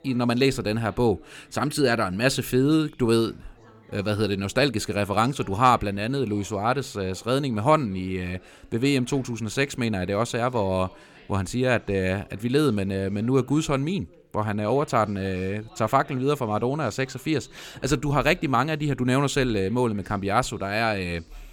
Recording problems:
background chatter; faint; throughout; 2 voices, 25 dB below the speech

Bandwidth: 17 kHz